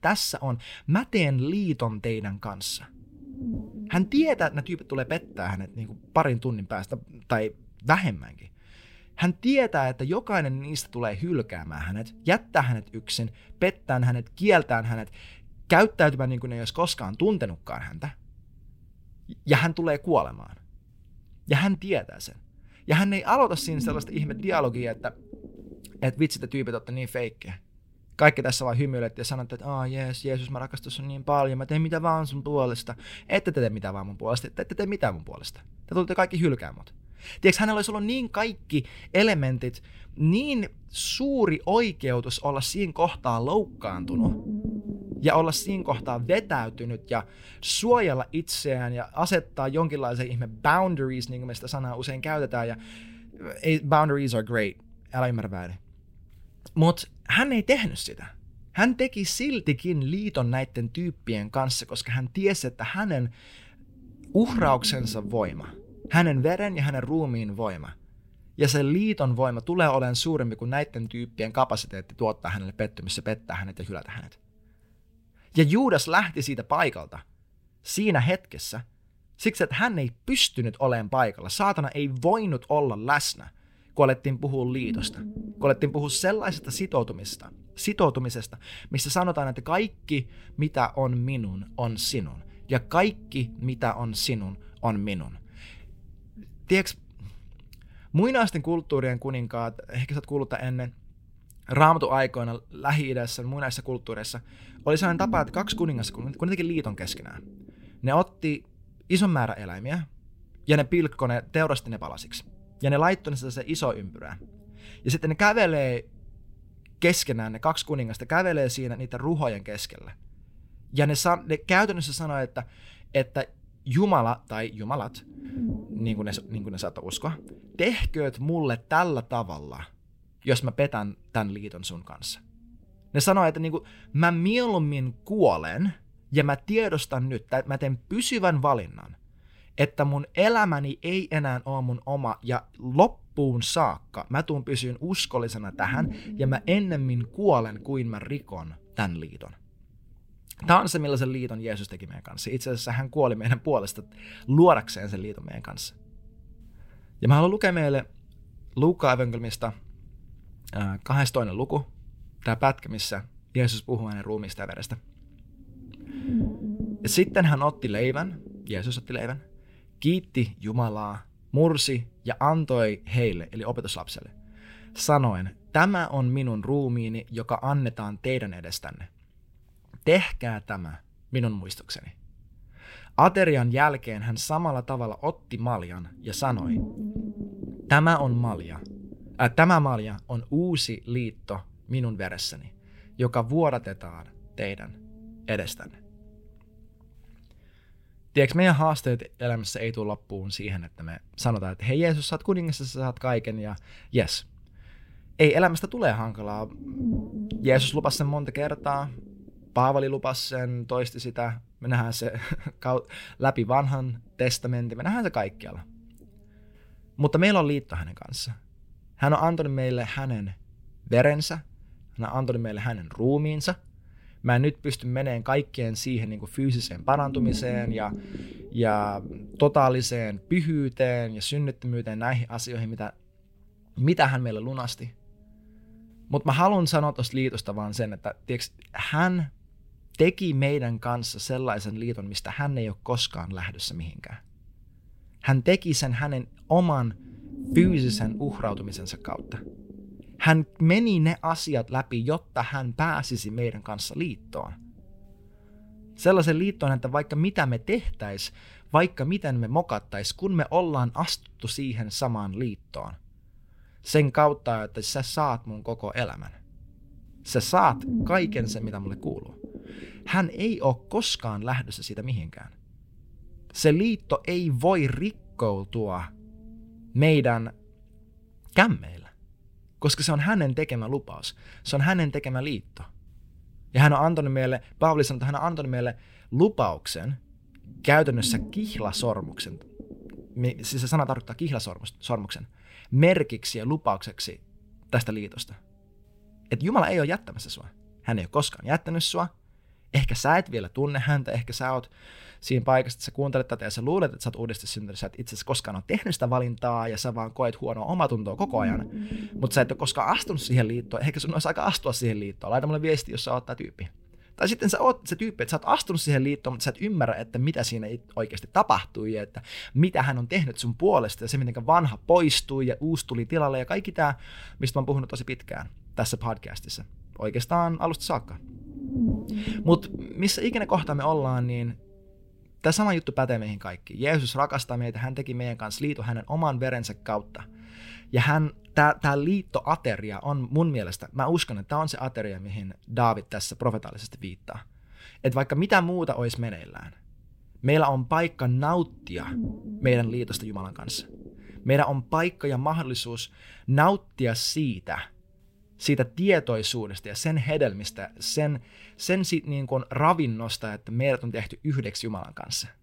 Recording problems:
low rumble; noticeable; throughout; 20 dB below the speech

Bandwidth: 16 kHz